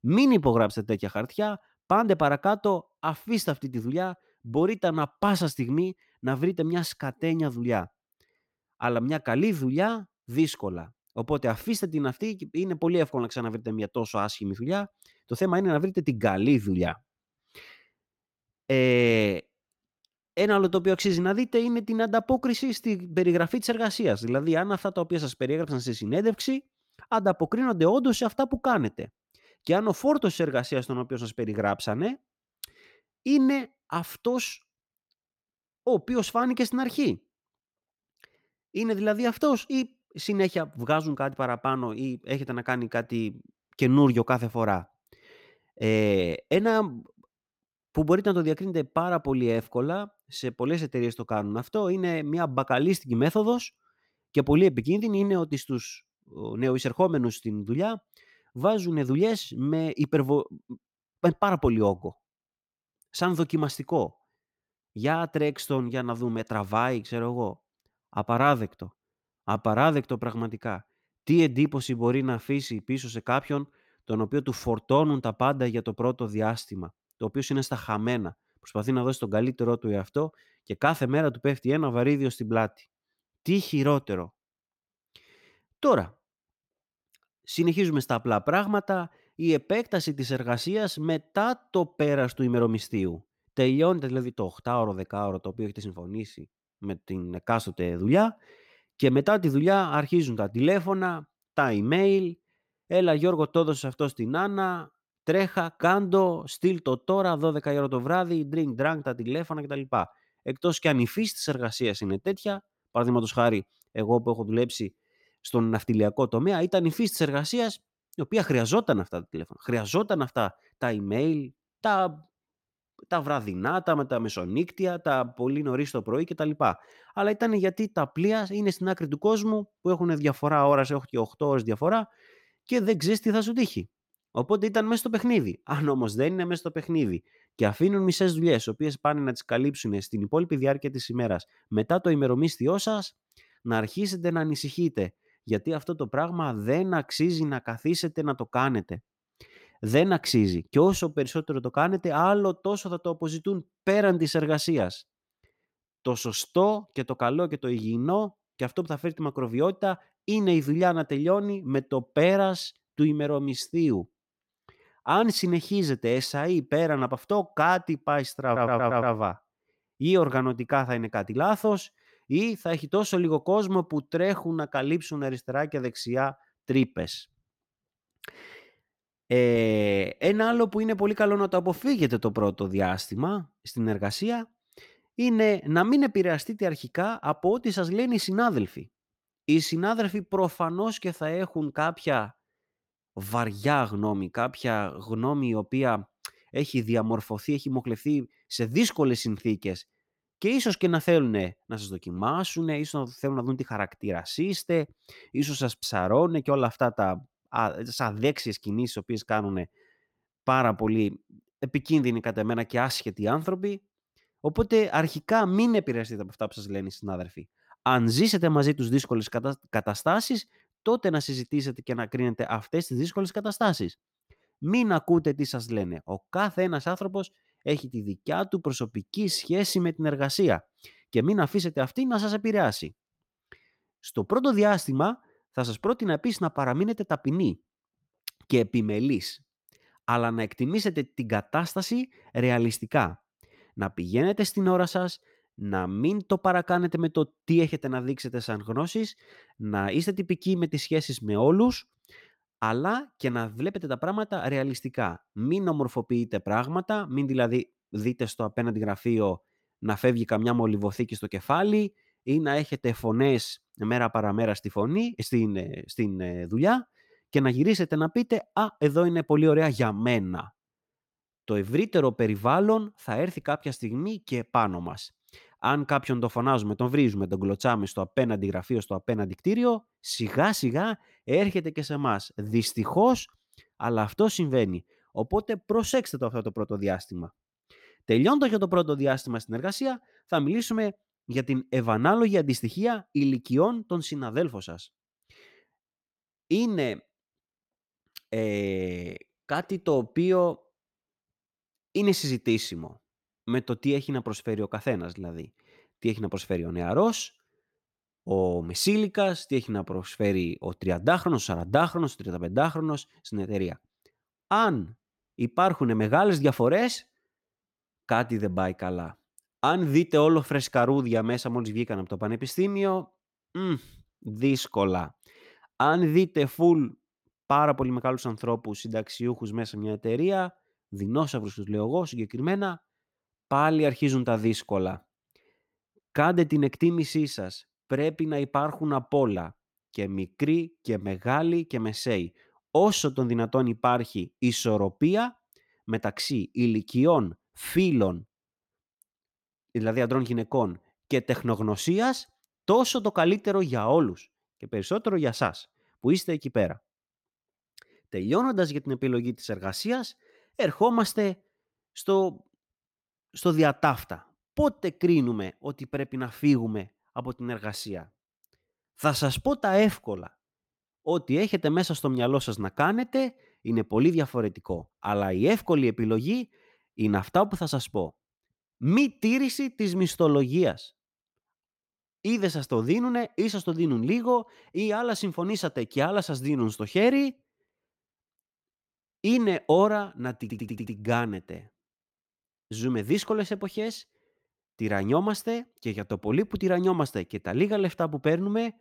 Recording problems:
audio stuttering; at 2:48 and at 6:30

